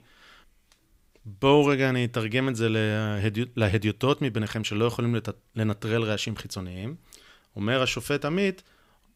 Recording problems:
none

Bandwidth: 15.5 kHz